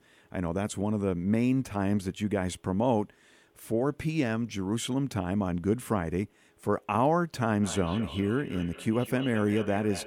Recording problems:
echo of what is said; noticeable; from 7.5 s on; 200 ms later, 15 dB below the speech

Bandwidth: 18.5 kHz